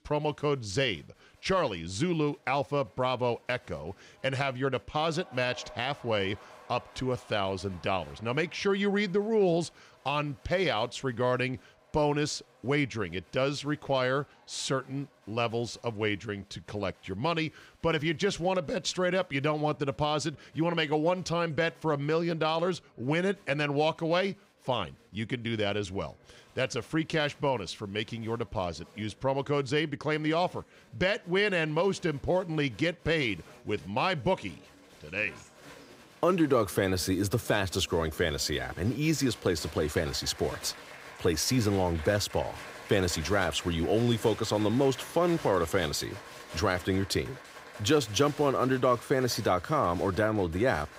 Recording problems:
crowd noise; noticeable; throughout; 20 dB below the speech

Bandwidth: 15.5 kHz